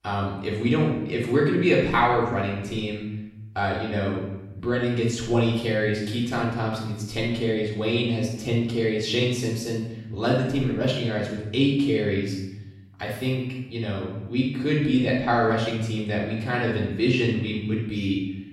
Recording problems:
off-mic speech; far
room echo; noticeable; dies away in 0.9 s

